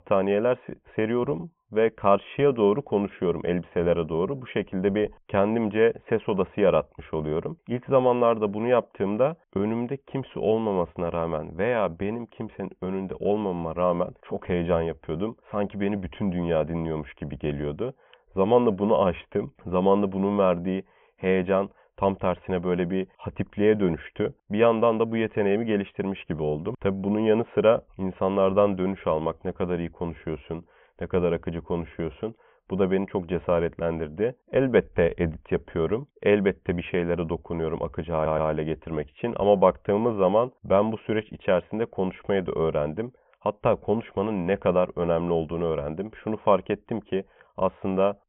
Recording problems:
high frequencies cut off; severe; nothing above 3.5 kHz
audio stuttering; at 38 s

